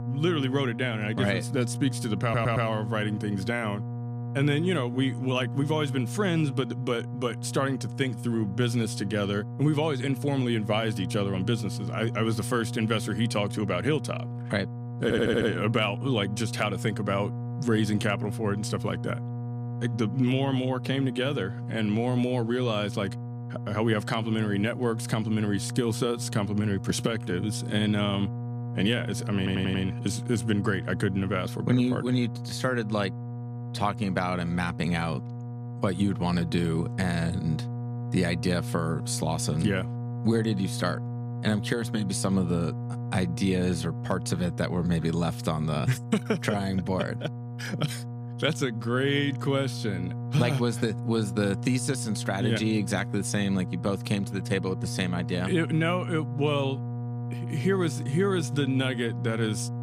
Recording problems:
electrical hum; noticeable; throughout; 60 Hz, 15 dB below the speech
audio stuttering; at 2 s, at 15 s and at 29 s

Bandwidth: 15 kHz